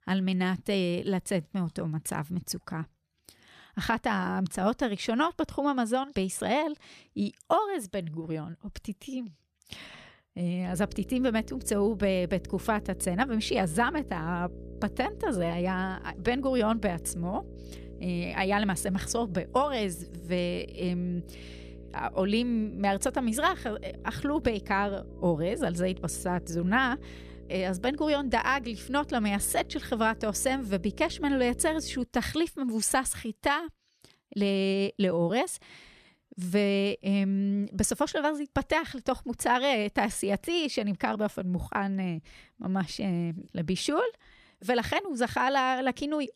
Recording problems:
electrical hum; faint; from 11 to 32 s; 60 Hz, 20 dB below the speech

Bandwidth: 14.5 kHz